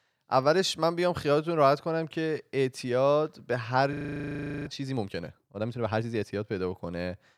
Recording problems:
audio freezing; at 4 s for 0.5 s

